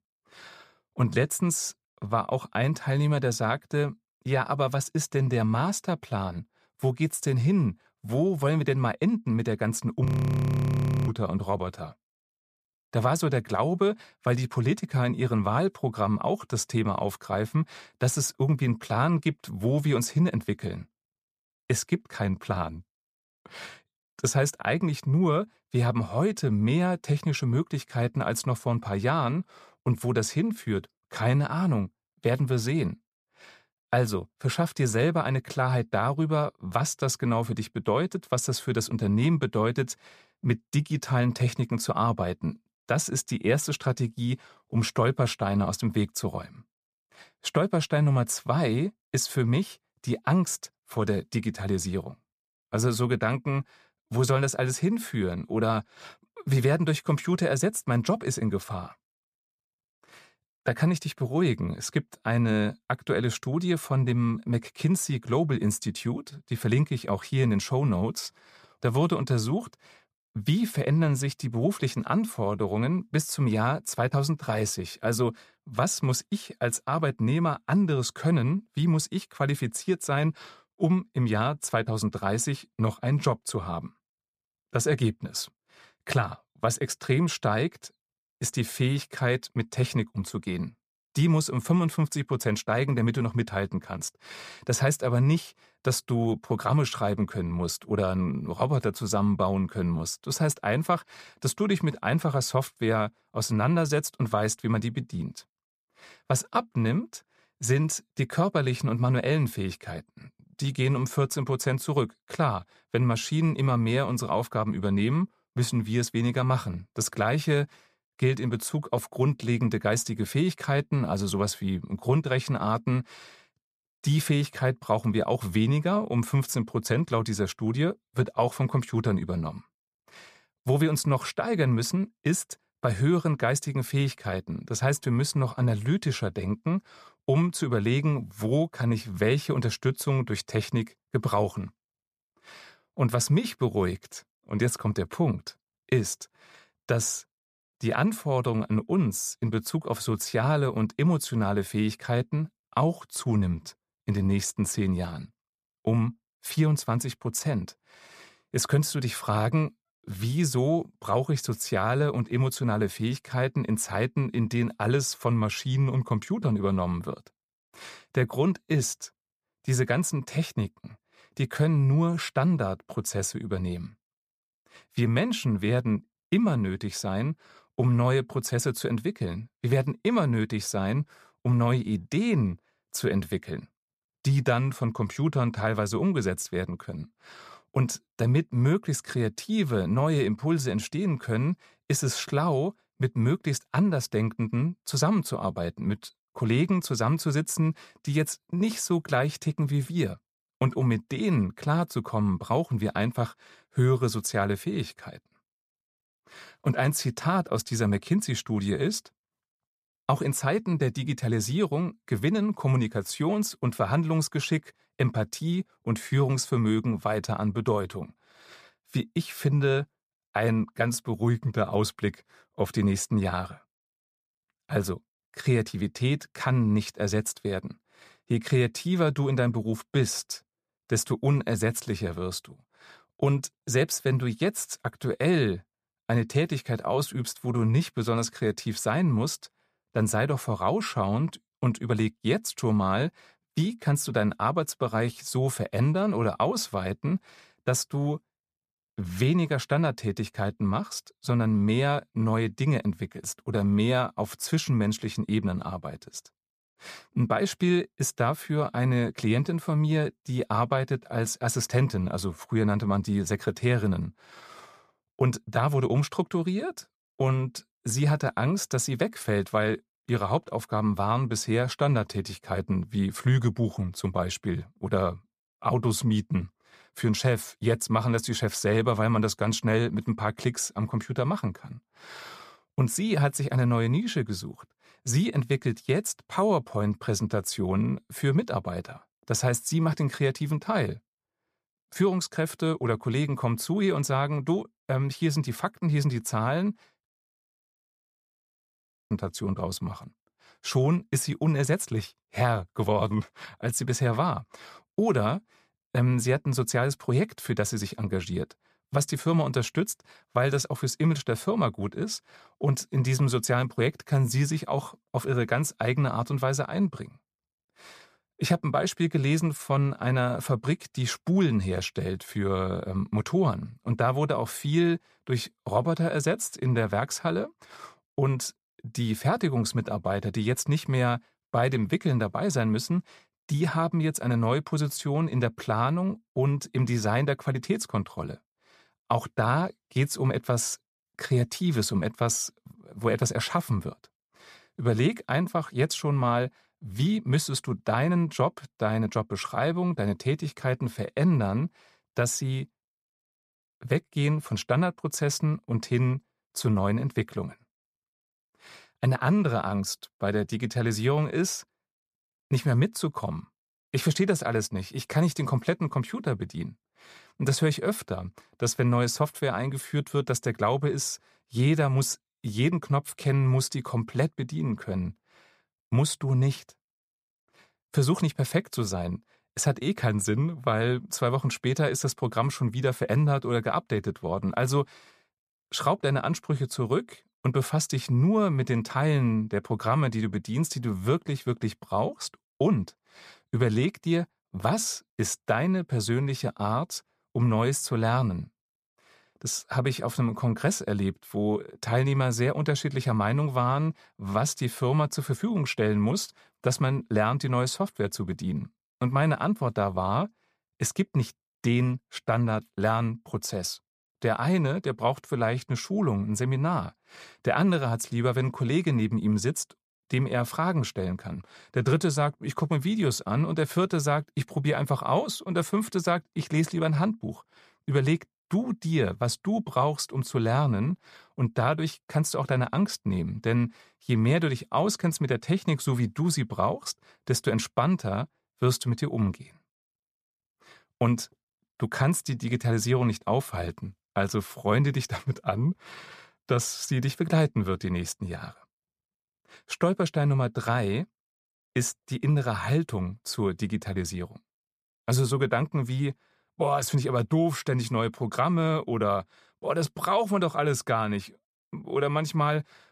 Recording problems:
audio freezing; at 10 s for 1 s and at 4:57 for 2 s

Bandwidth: 14.5 kHz